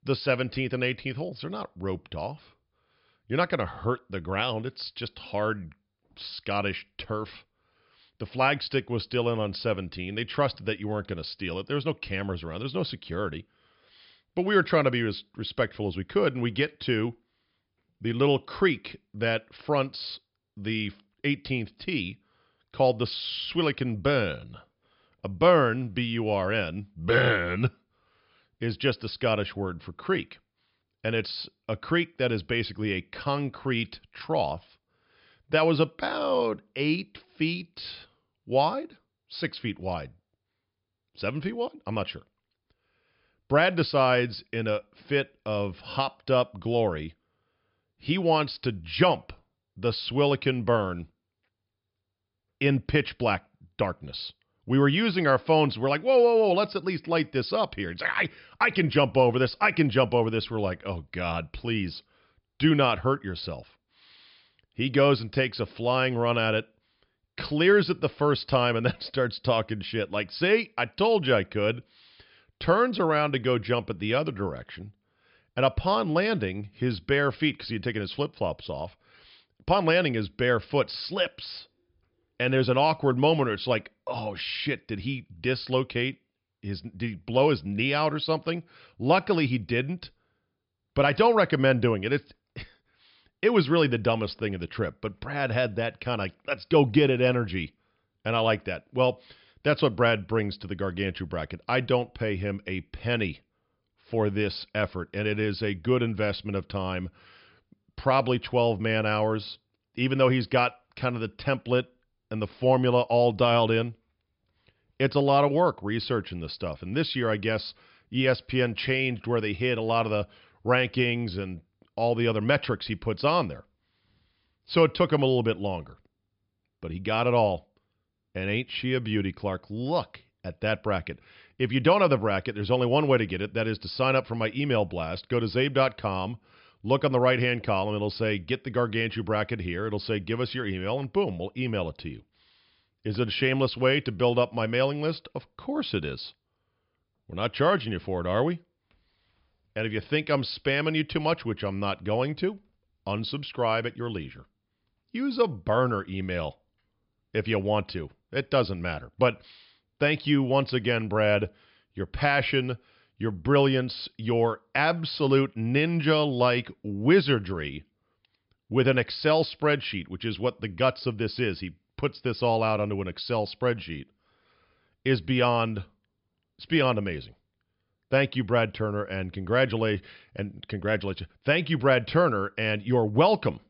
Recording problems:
high frequencies cut off; noticeable; nothing above 5.5 kHz

